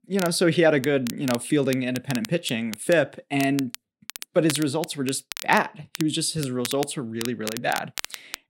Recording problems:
crackle, like an old record; noticeable; 10 dB below the speech

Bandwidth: 16 kHz